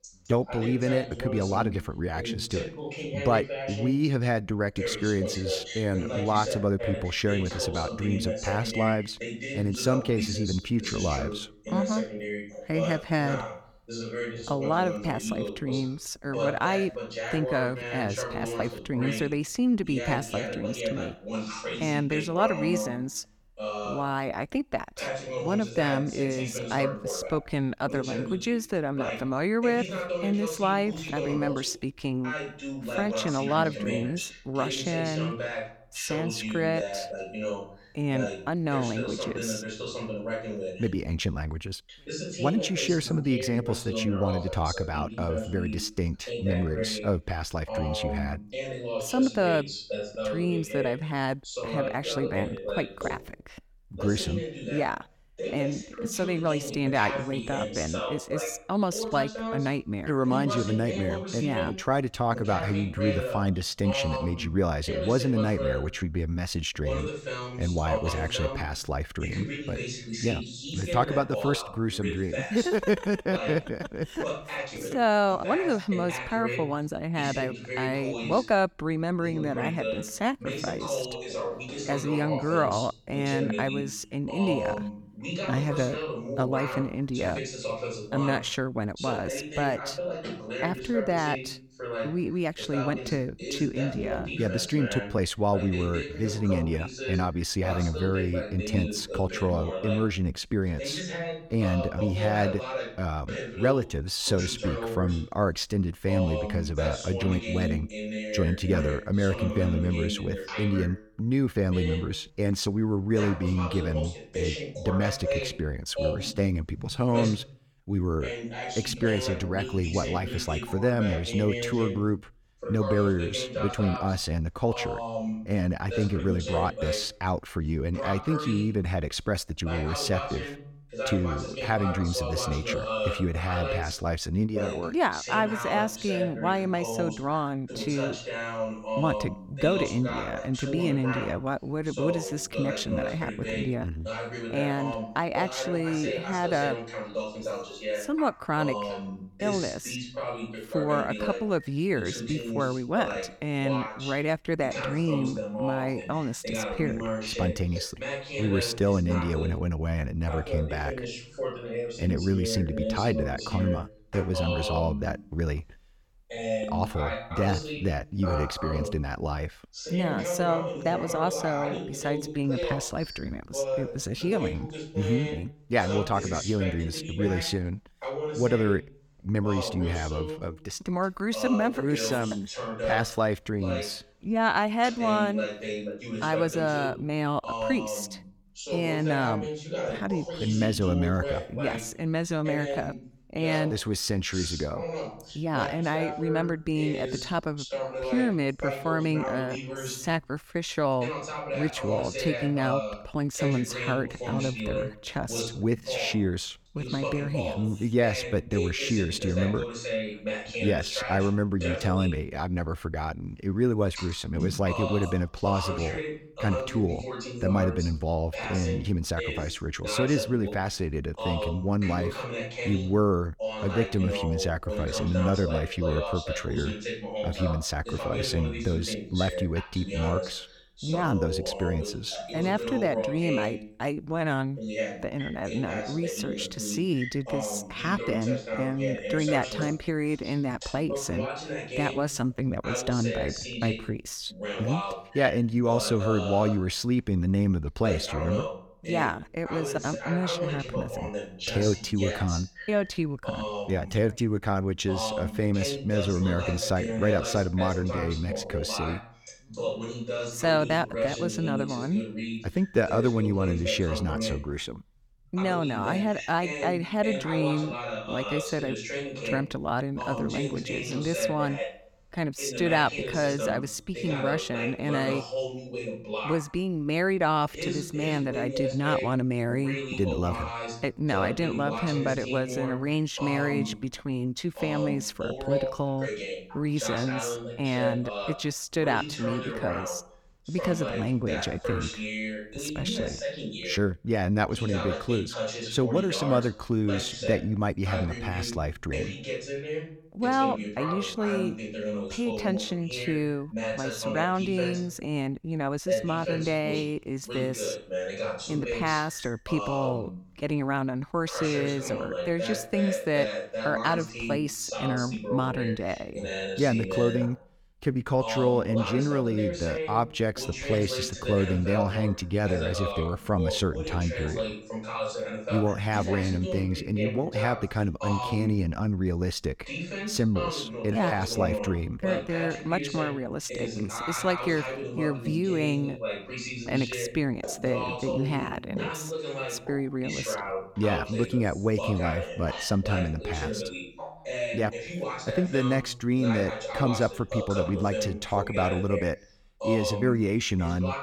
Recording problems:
voice in the background; loud; throughout; 5 dB below the speech

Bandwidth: 18 kHz